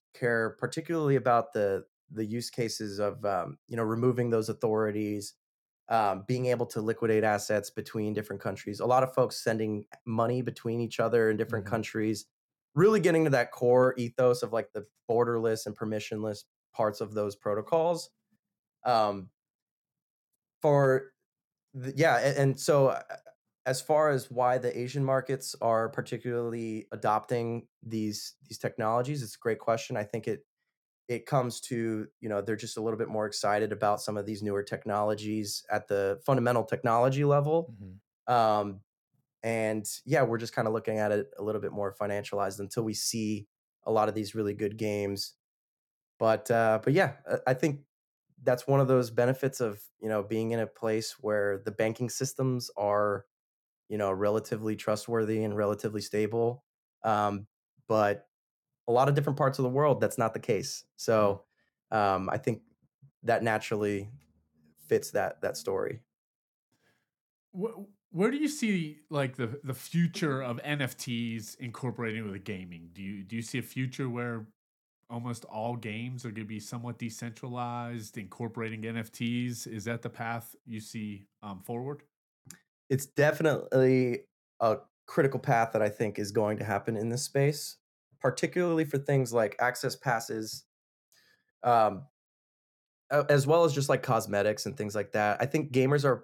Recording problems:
none

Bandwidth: 18 kHz